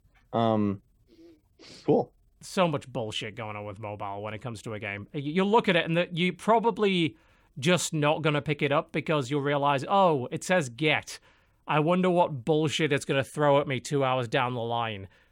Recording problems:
none

